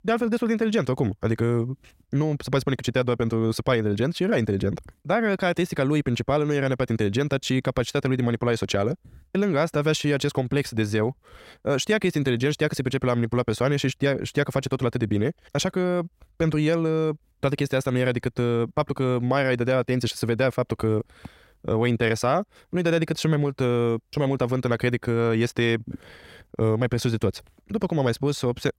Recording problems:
wrong speed, natural pitch; too fast; 1.6 times normal speed

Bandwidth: 16 kHz